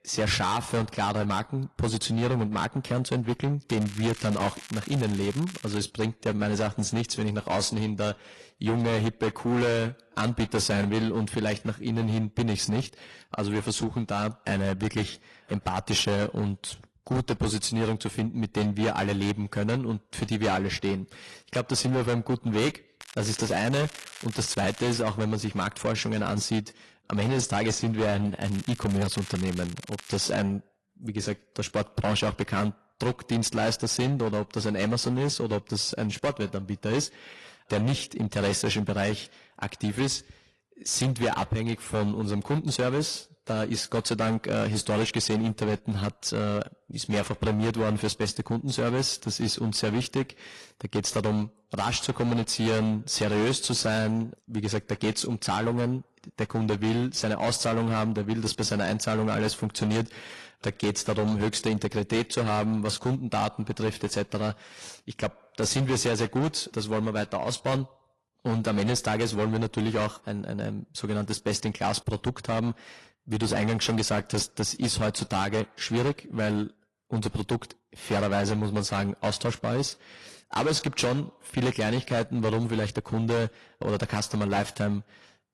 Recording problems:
distortion; heavy; 13% of the sound clipped
garbled, watery; slightly
crackling; noticeable; from 3.5 to 6 s, from 23 to 25 s and from 28 to 30 s; 15 dB below the speech

